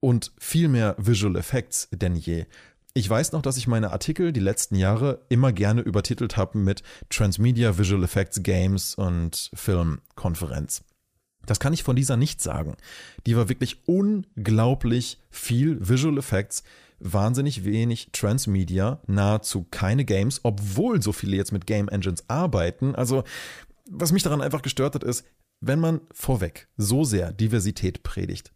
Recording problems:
none

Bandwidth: 15 kHz